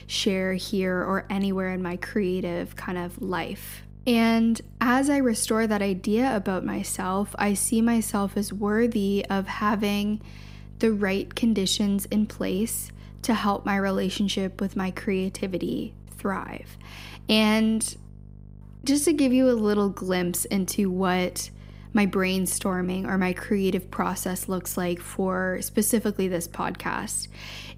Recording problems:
electrical hum; faint; throughout; 50 Hz, 30 dB below the speech

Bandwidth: 15.5 kHz